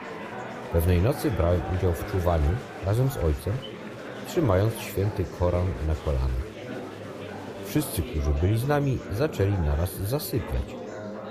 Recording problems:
murmuring crowd; loud; throughout; 10 dB below the speech

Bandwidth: 15 kHz